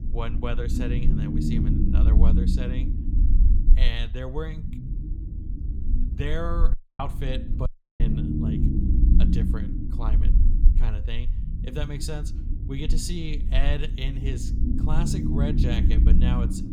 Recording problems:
low rumble; loud; throughout; 2 dB below the speech
audio cutting out; at 6.5 s and at 7.5 s

